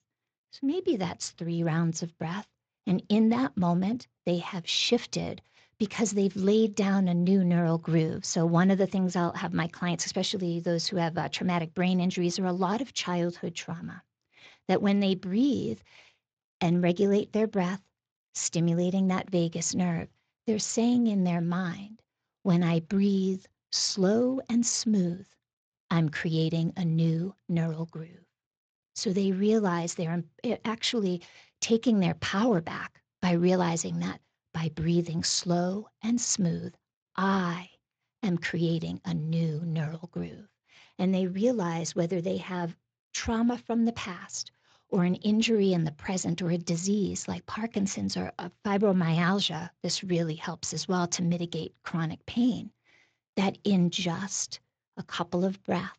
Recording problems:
garbled, watery; slightly; nothing above 7.5 kHz

